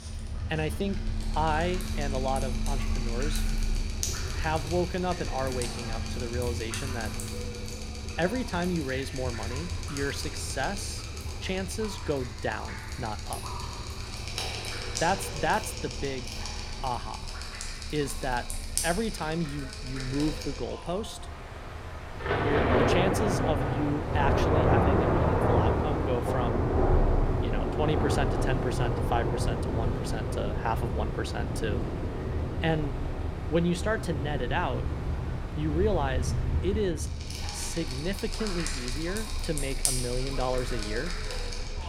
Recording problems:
rain or running water; very loud; throughout; 1 dB above the speech

